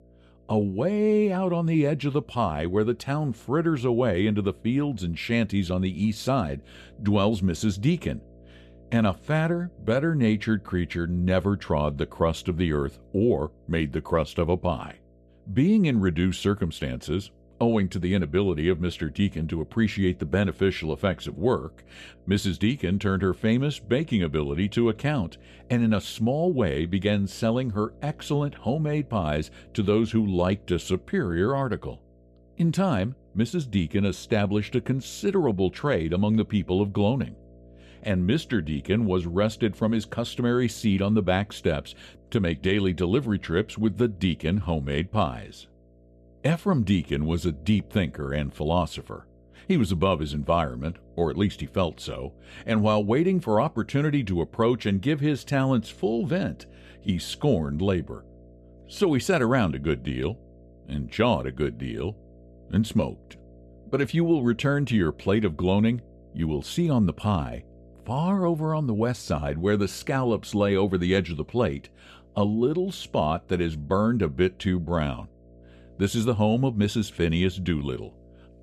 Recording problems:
electrical hum; faint; throughout; 60 Hz, 30 dB below the speech

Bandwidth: 14 kHz